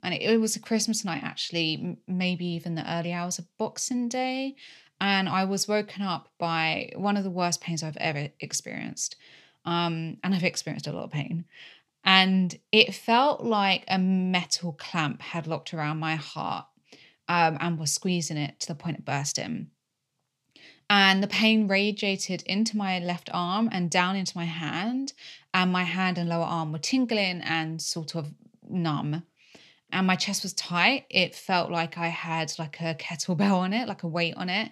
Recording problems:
none

